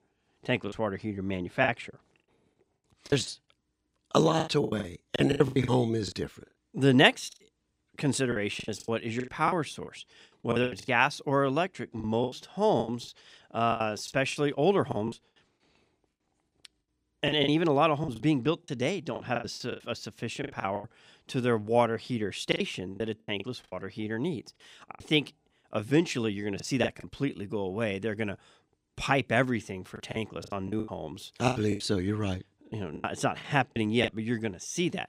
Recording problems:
choppy; very; 13% of the speech affected

